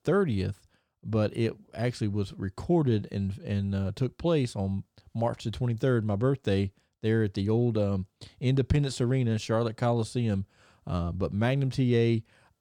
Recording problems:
none

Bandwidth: 18 kHz